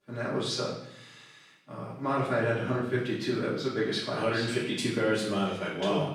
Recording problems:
off-mic speech; far
room echo; noticeable; dies away in 0.7 s

